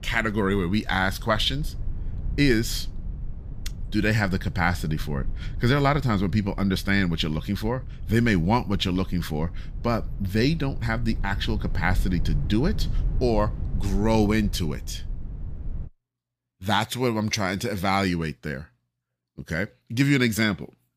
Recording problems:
low rumble; faint; until 16 s; 20 dB below the speech

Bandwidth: 15 kHz